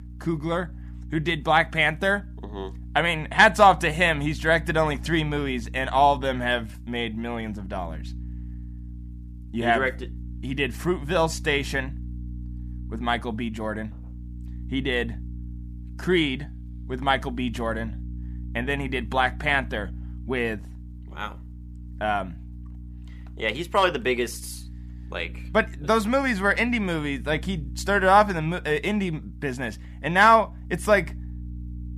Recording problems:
electrical hum; faint; throughout; 60 Hz, 30 dB below the speech

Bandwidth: 15 kHz